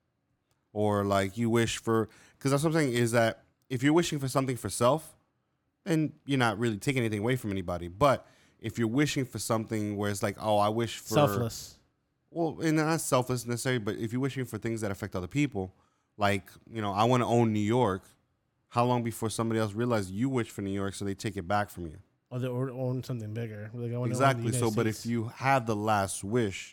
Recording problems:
none

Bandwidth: 17.5 kHz